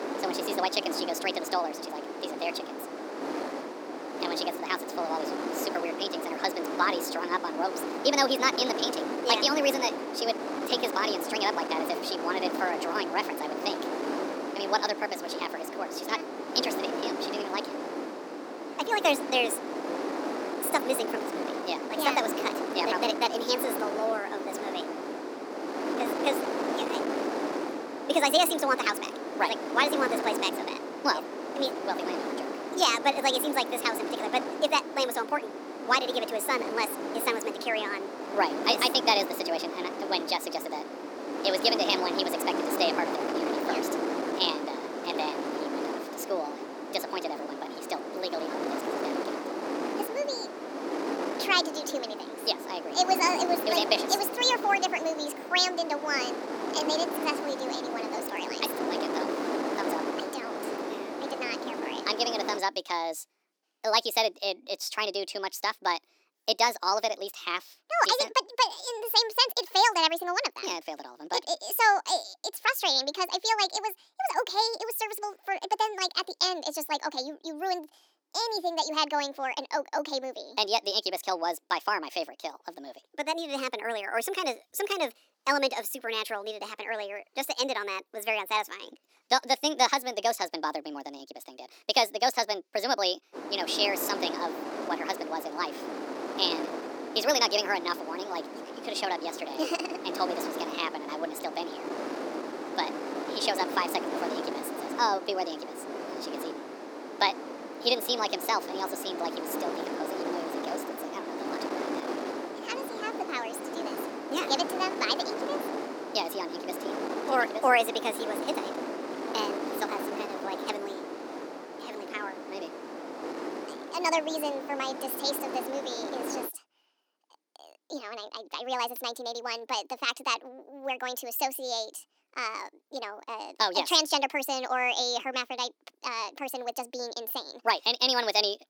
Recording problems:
wrong speed and pitch; too fast and too high; 1.5 times normal speed
thin; somewhat; fading below 300 Hz
wind noise on the microphone; heavy; until 1:03 and from 1:33 to 2:06; 7 dB below the speech

